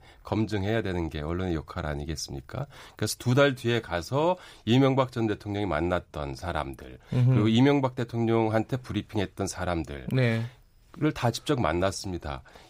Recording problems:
none

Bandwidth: 15.5 kHz